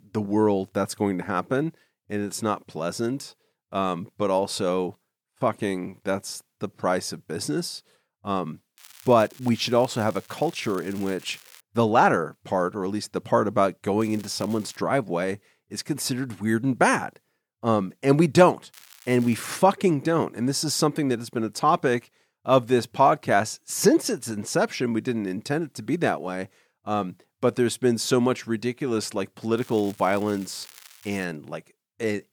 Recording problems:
crackling; faint; 4 times, first at 9 s; 25 dB below the speech

